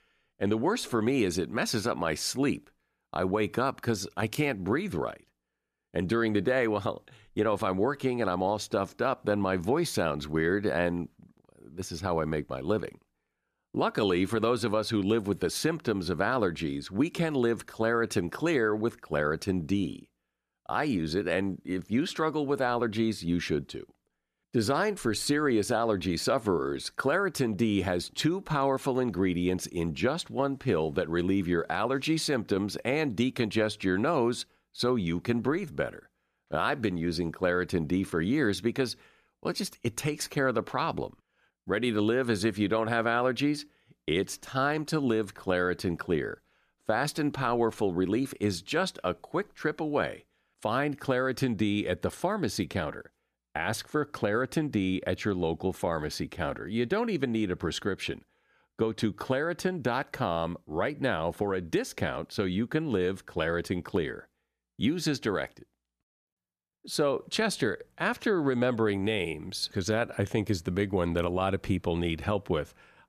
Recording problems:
none

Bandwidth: 14.5 kHz